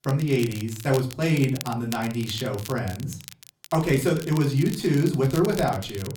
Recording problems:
off-mic speech; far
room echo; very slight; dies away in 0.4 s
crackle, like an old record; noticeable; 15 dB below the speech

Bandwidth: 17.5 kHz